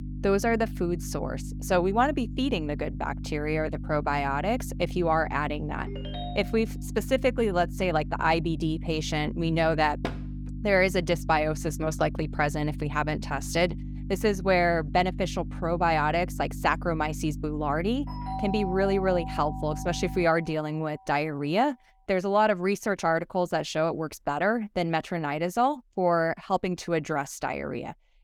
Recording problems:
electrical hum; noticeable; until 20 s; 50 Hz, 20 dB below the speech
phone ringing; faint; at 6 s; peak 10 dB below the speech
door banging; noticeable; at 10 s; peak 9 dB below the speech
doorbell; noticeable; from 18 to 21 s; peak 7 dB below the speech

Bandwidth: 18 kHz